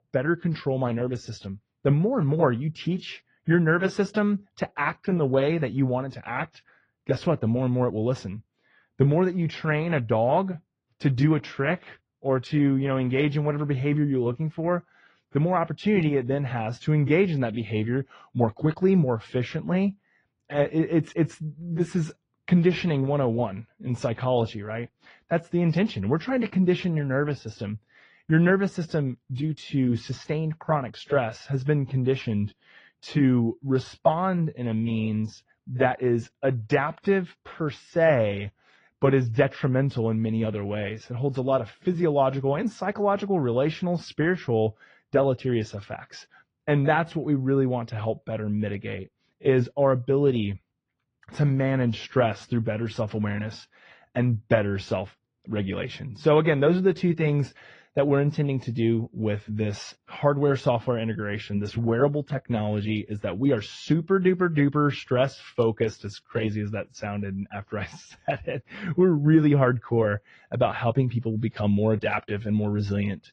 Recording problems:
muffled; slightly; fading above 3.5 kHz
garbled, watery; slightly

